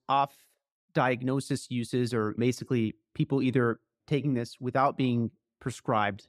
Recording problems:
none

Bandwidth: 14 kHz